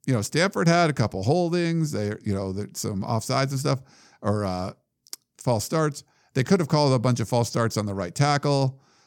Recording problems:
none

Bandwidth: 17.5 kHz